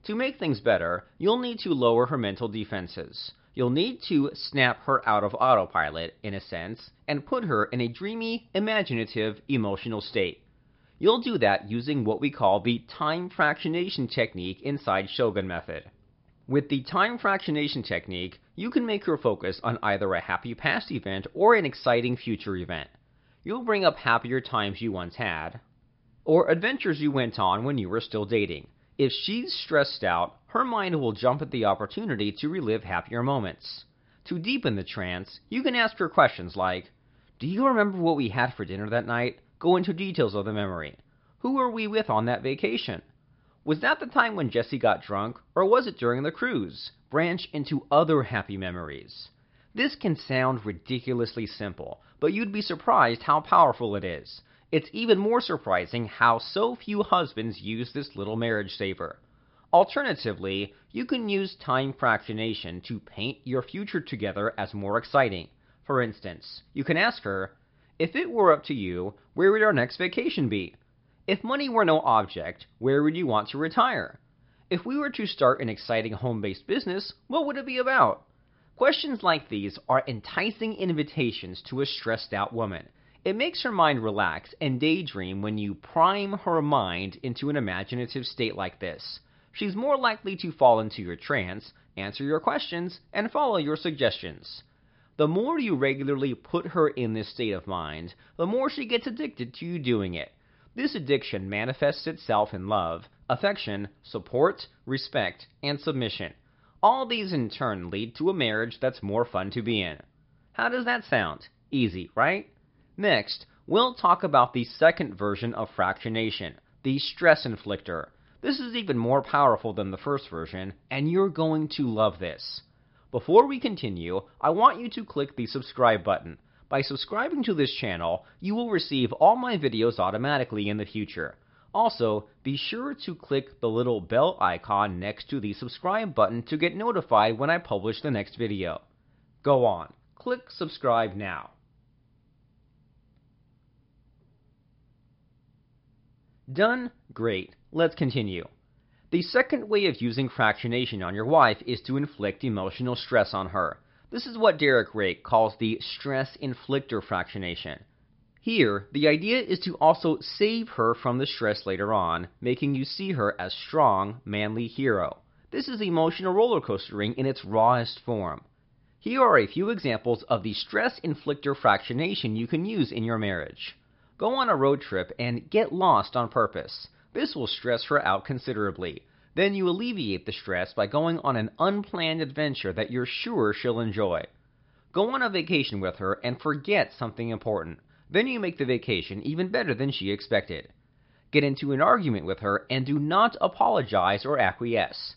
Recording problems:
high frequencies cut off; noticeable; nothing above 5 kHz

